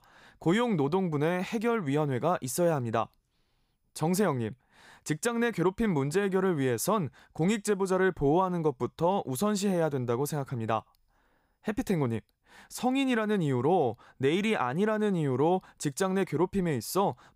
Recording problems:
none

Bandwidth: 15.5 kHz